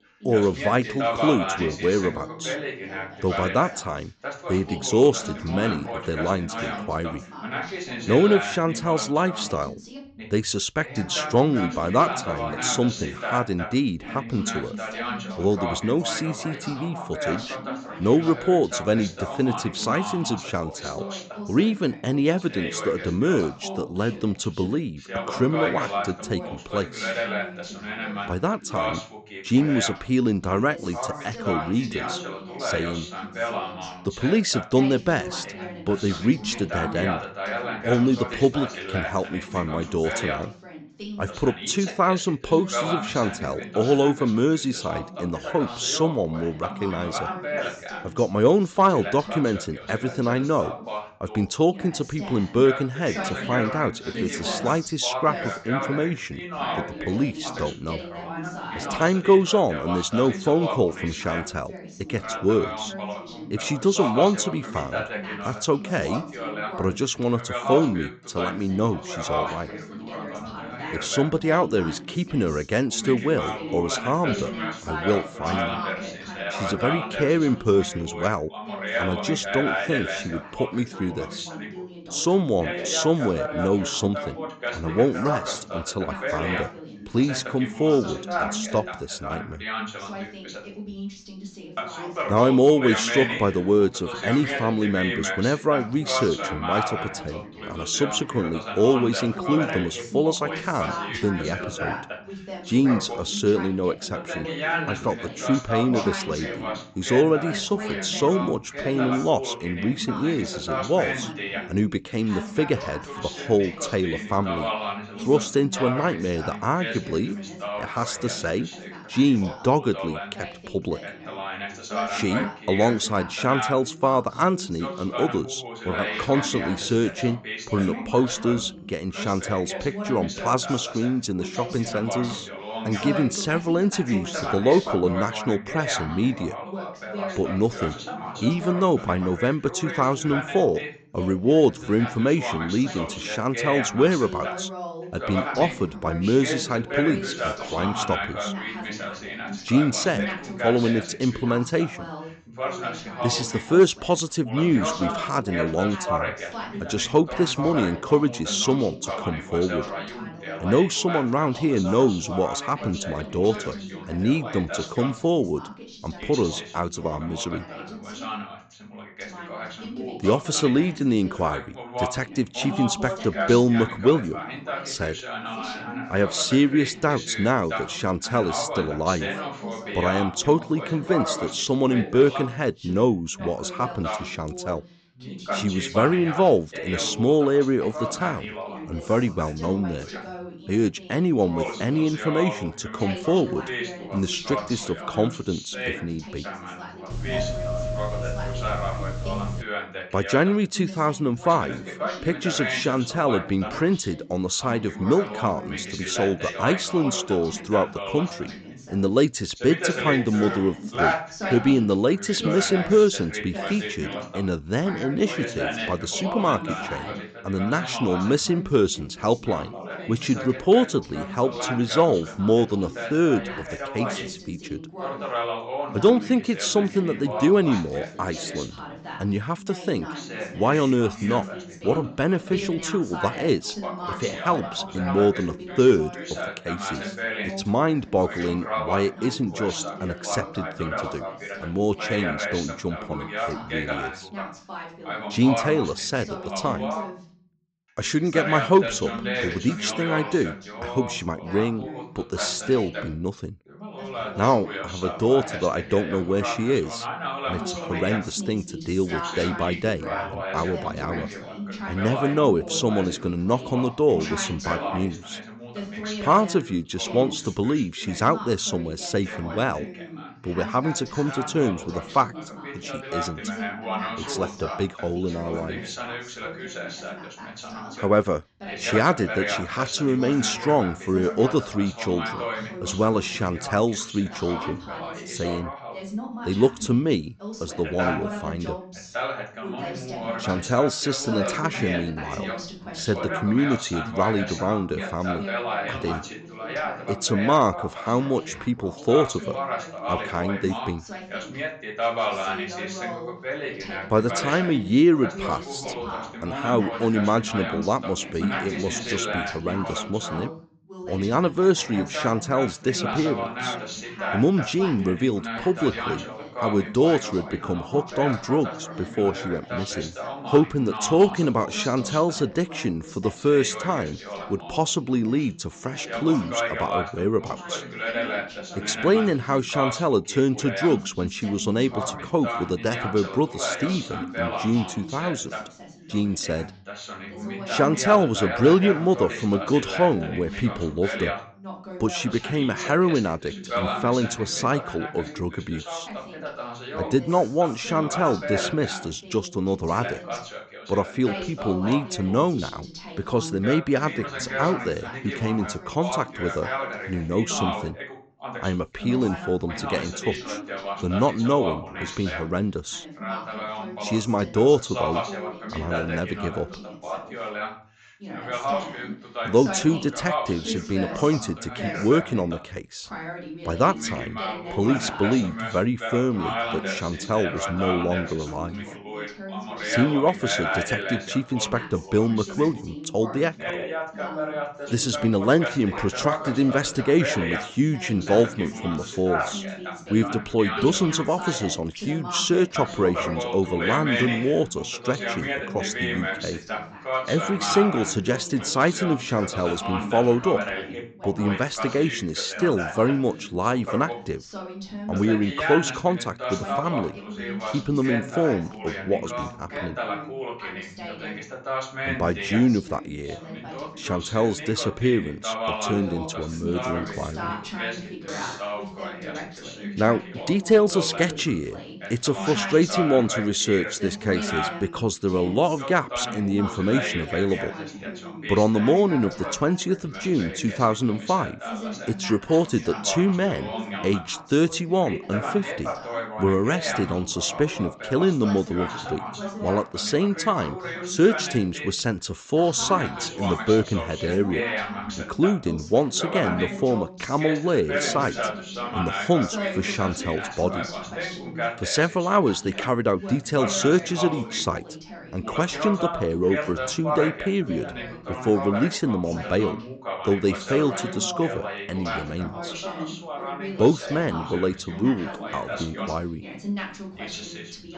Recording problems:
high frequencies cut off; noticeable; nothing above 8 kHz
background chatter; loud; throughout; 2 voices, 8 dB below the speech
doorbell; noticeable; from 3:17 to 3:20; peak 3 dB below the speech
alarm; faint; at 6:58; peak 10 dB below the speech

